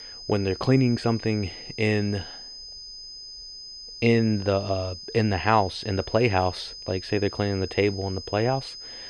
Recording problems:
muffled; very slightly; fading above 3.5 kHz
high-pitched whine; noticeable; throughout; 5 kHz, 15 dB below the speech

